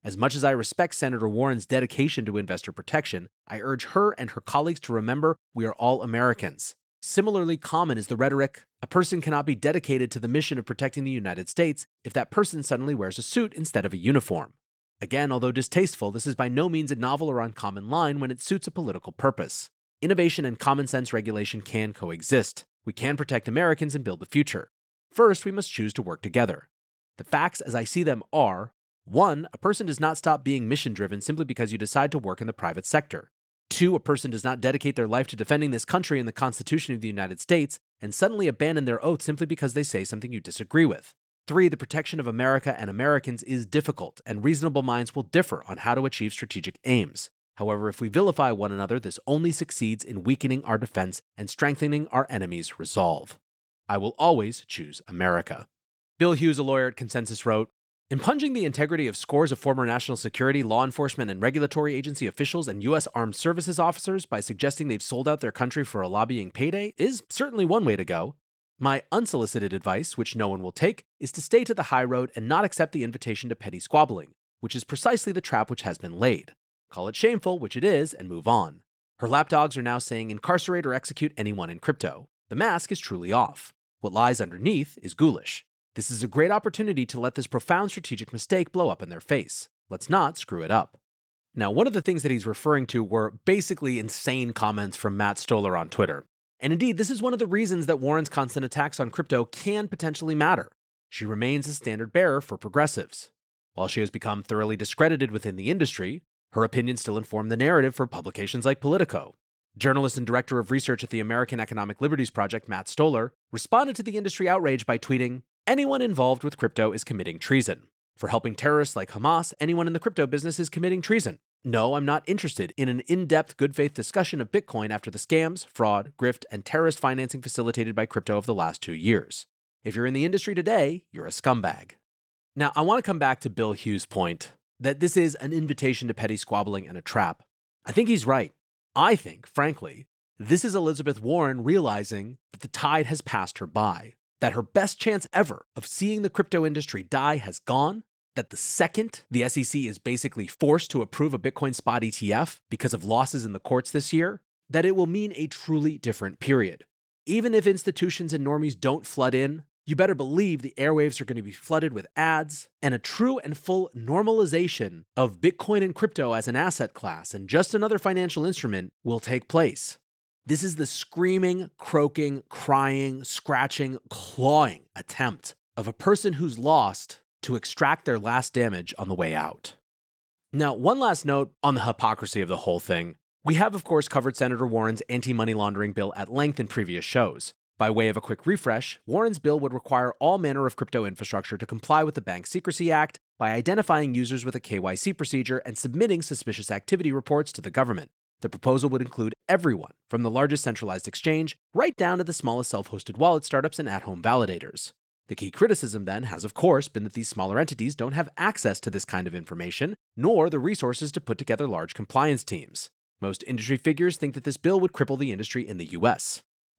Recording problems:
garbled, watery; slightly; nothing above 17.5 kHz

